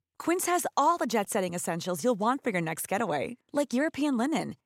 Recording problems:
none

